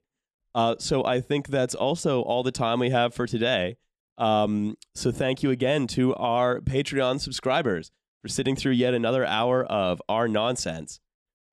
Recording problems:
none

